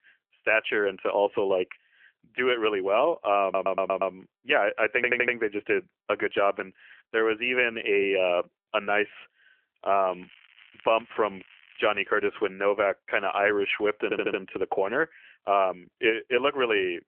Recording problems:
phone-call audio; nothing above 3 kHz
crackling; faint; from 10 to 12 s; 25 dB below the speech
audio stuttering; at 3.5 s, at 5 s and at 14 s

